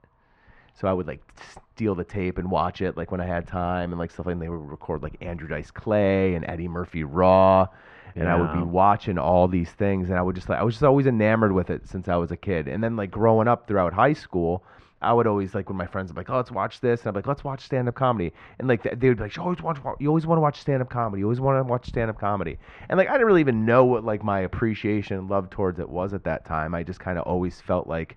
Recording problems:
muffled; very; fading above 2 kHz

